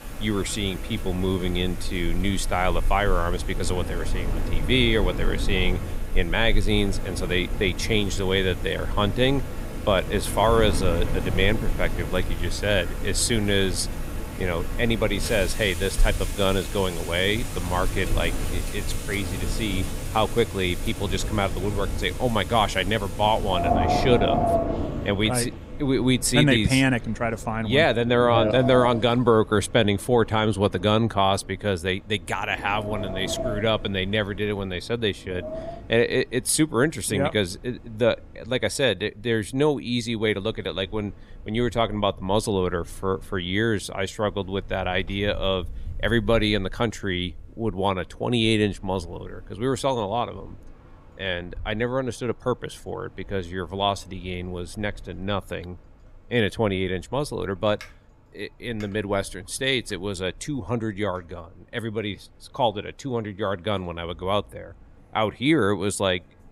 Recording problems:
wind in the background; loud; throughout; 7 dB below the speech

